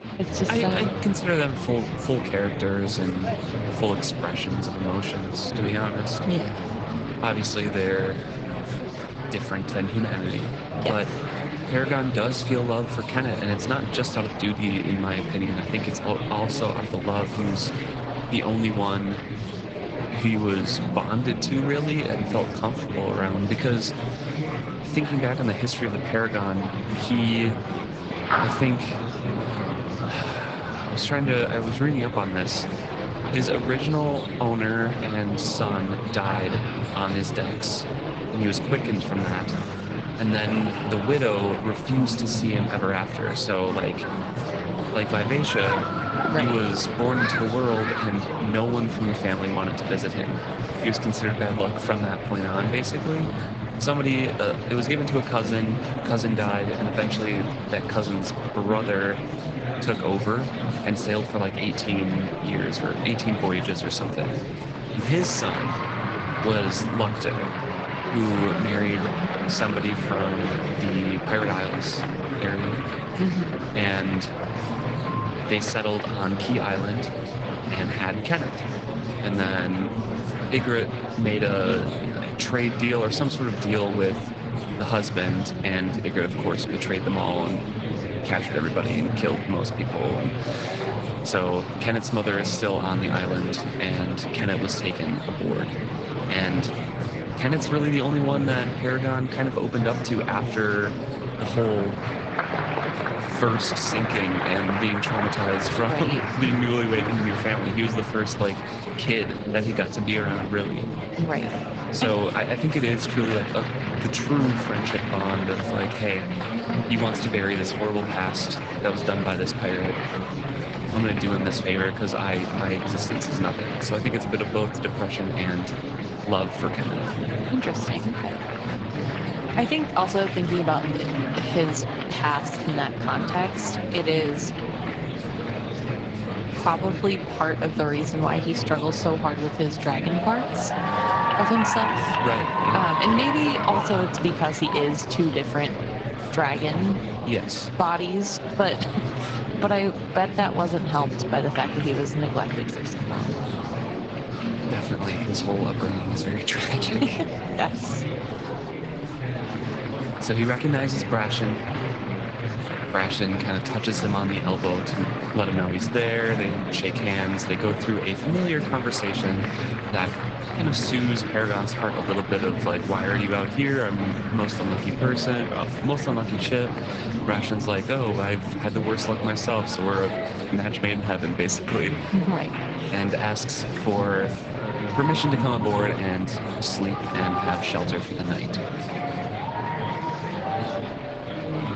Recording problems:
garbled, watery; slightly; nothing above 7.5 kHz
murmuring crowd; loud; throughout; 3 dB below the speech

